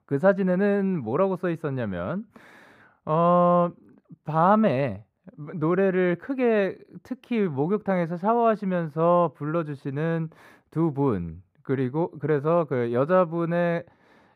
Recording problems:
muffled; slightly; fading above 2.5 kHz

